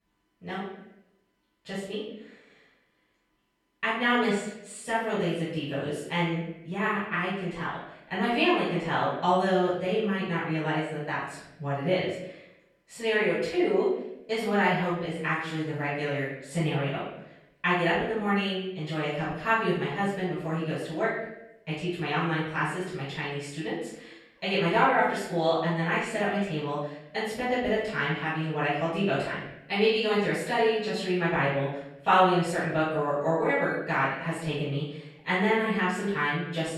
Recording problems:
off-mic speech; far
room echo; noticeable; dies away in 0.8 s

